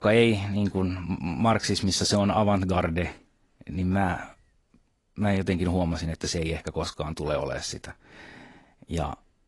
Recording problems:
garbled, watery; slightly; nothing above 10.5 kHz

